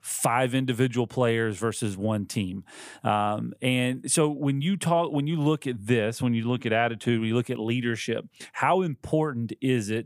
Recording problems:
none

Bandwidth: 15 kHz